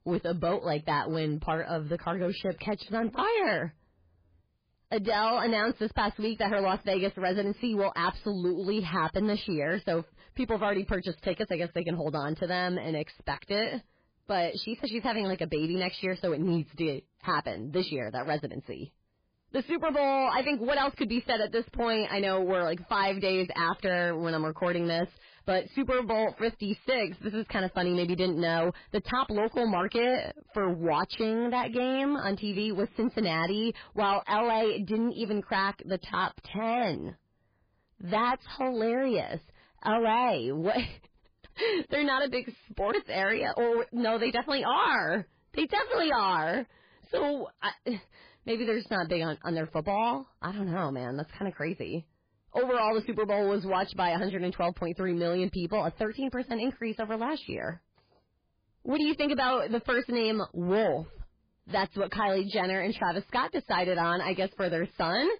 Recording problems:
garbled, watery; badly; nothing above 4.5 kHz
distortion; slight; 8% of the sound clipped

